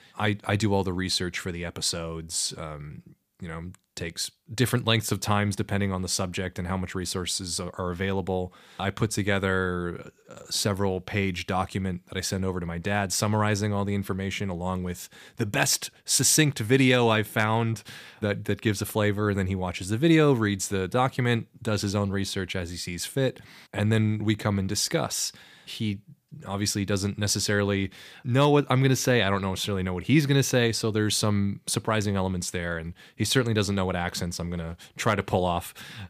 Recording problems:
none

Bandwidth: 15 kHz